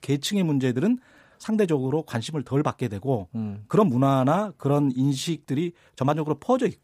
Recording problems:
uneven, jittery; strongly; from 0.5 to 6 s

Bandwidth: 15 kHz